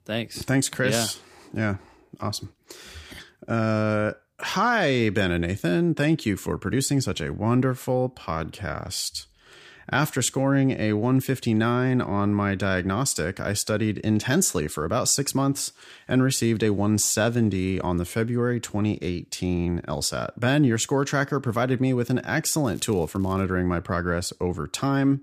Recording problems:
crackling; faint; at 23 s; 30 dB below the speech

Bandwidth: 15 kHz